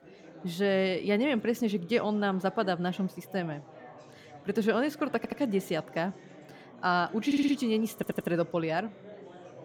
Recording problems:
chatter from many people; faint; throughout; 20 dB below the speech
audio stuttering; at 5 s, at 7.5 s and at 8 s

